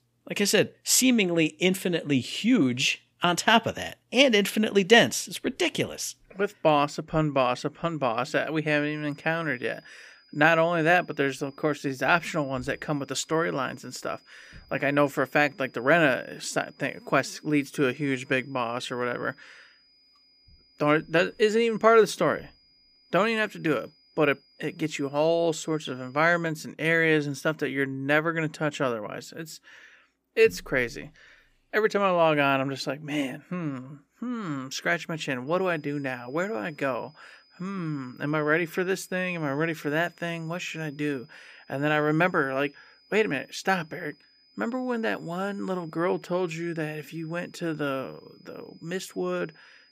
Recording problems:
high-pitched whine; faint; from 8.5 to 26 s and from 35 s on; 5 kHz, 30 dB below the speech

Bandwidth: 15 kHz